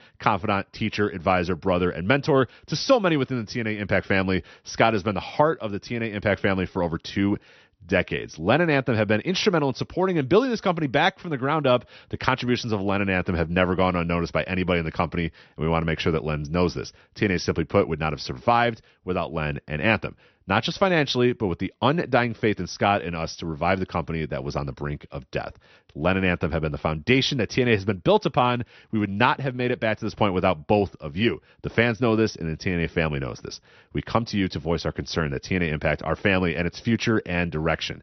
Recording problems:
high frequencies cut off; noticeable; nothing above 6 kHz

